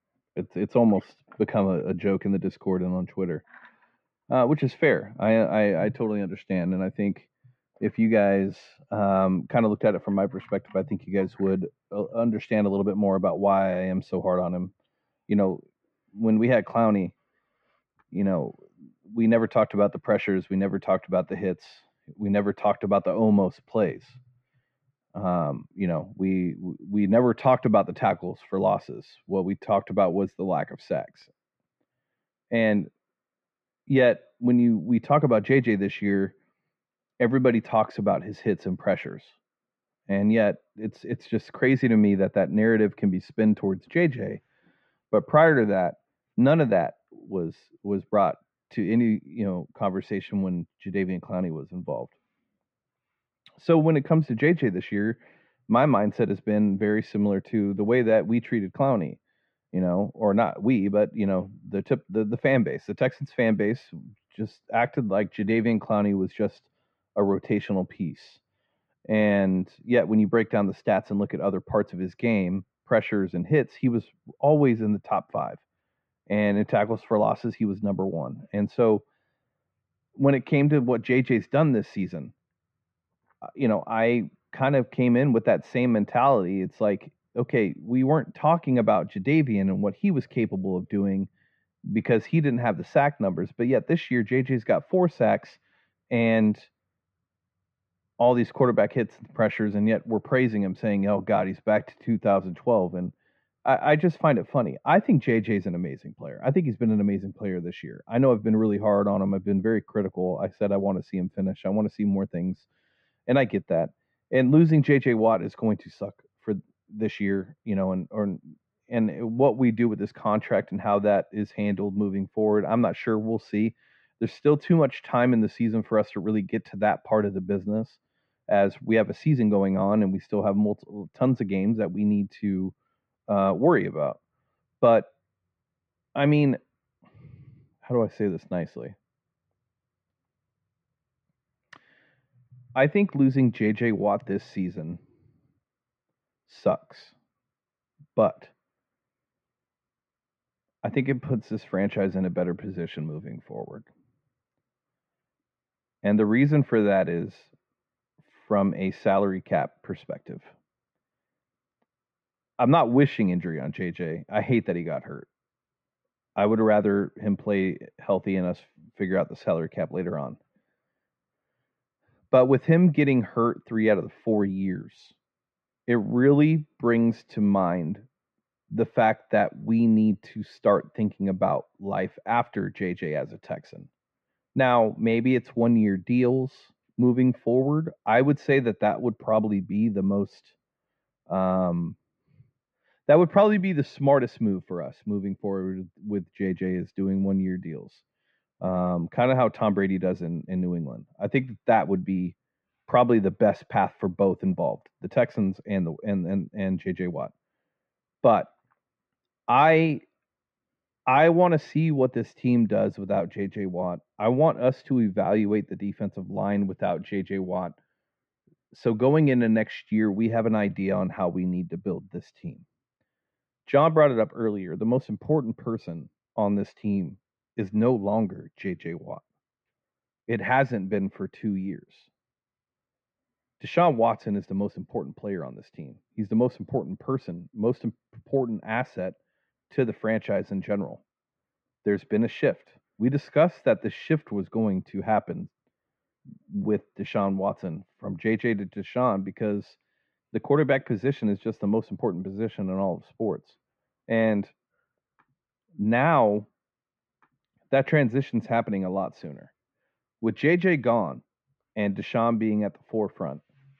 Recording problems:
muffled; very; fading above 2 kHz

